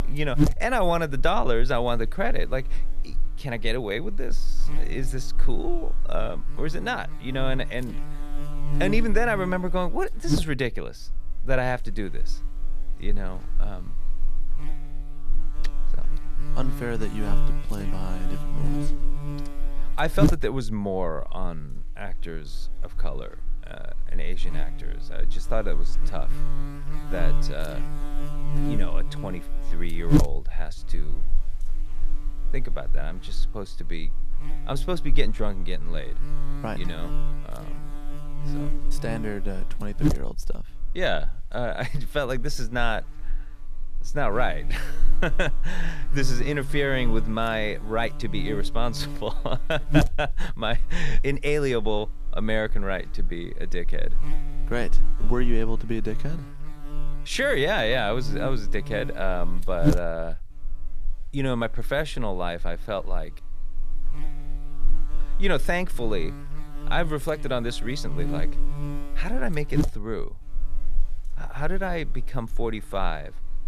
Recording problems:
electrical hum; loud; throughout; 50 Hz, 10 dB below the speech

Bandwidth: 14 kHz